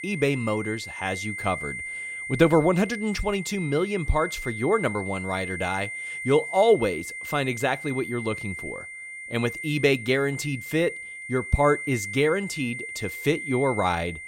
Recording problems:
high-pitched whine; loud; throughout; 2 kHz, 8 dB below the speech

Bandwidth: 16 kHz